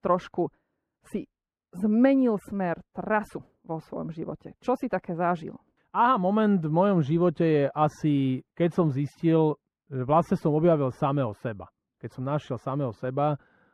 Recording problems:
muffled; very; fading above 3 kHz

